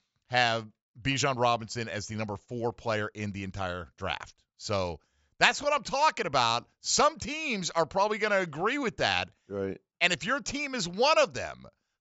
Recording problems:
high frequencies cut off; noticeable; nothing above 8 kHz

